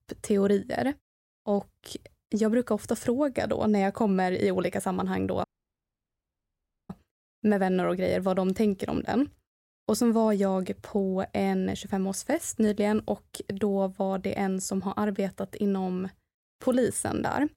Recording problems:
audio cutting out; at 5.5 s for 1.5 s

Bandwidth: 16 kHz